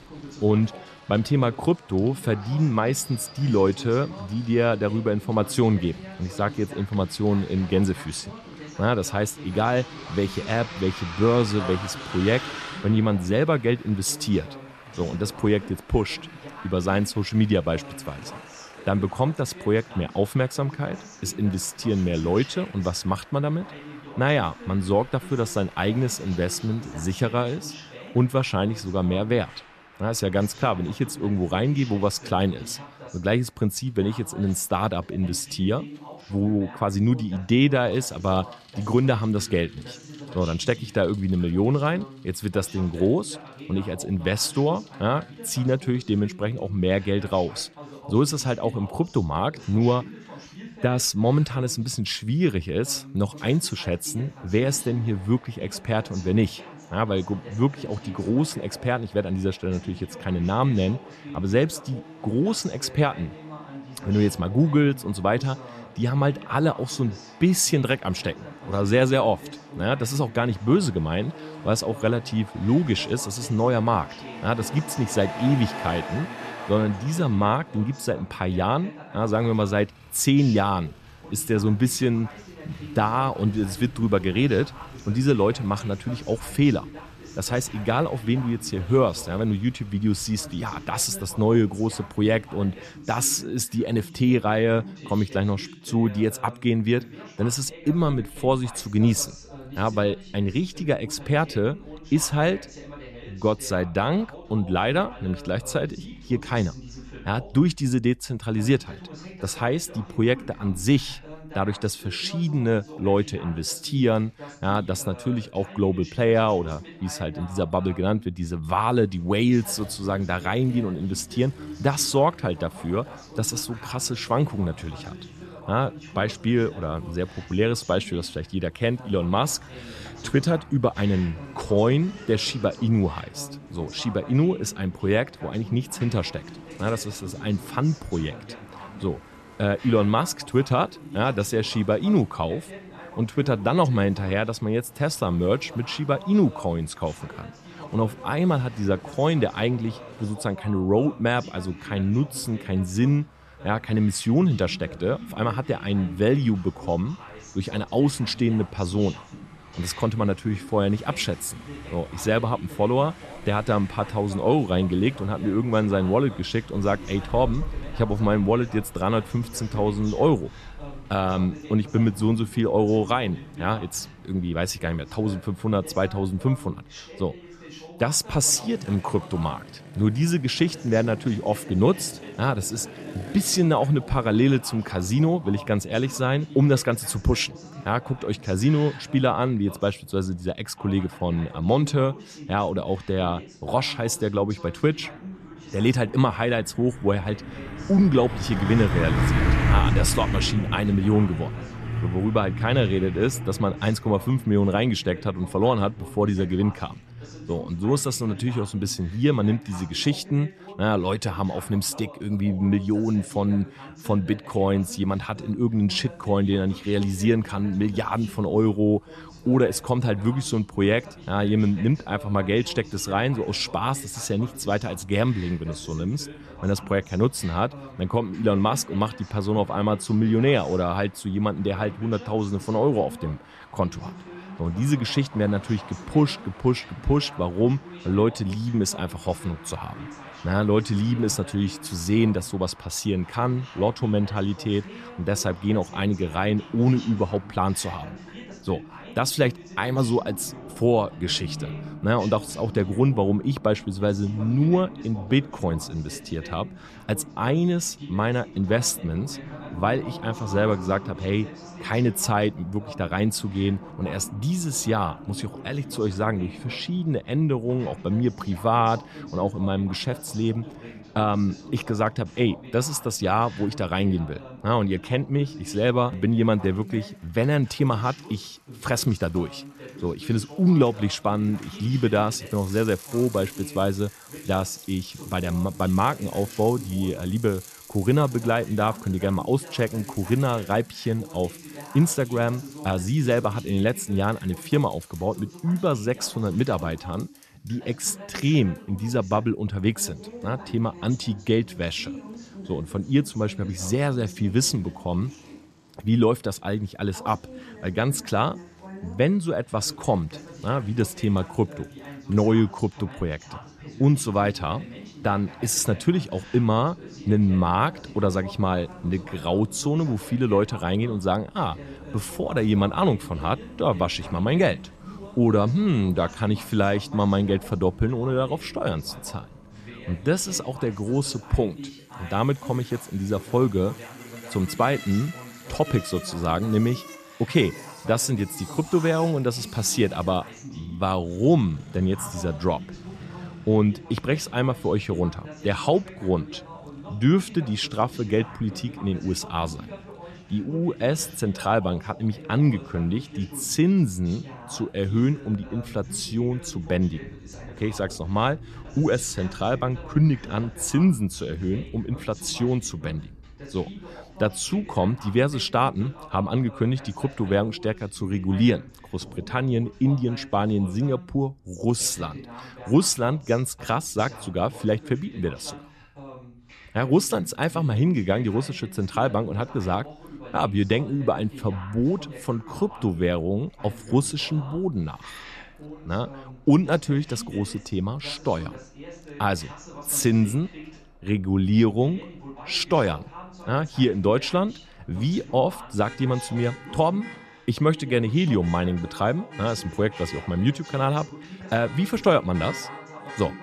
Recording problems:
traffic noise; noticeable; throughout; 15 dB below the speech
voice in the background; noticeable; throughout; 20 dB below the speech

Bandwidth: 14 kHz